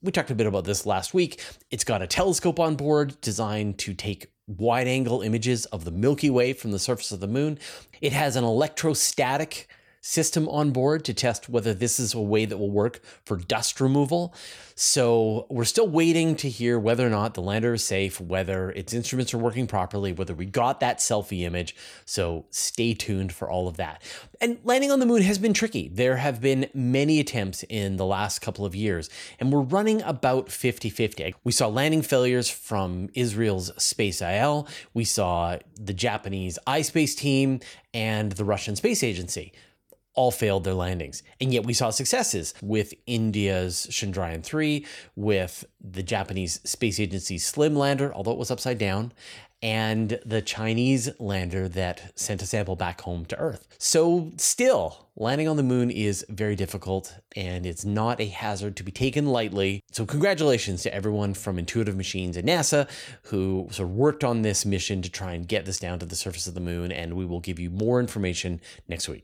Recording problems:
none

